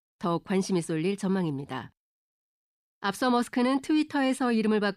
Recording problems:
none

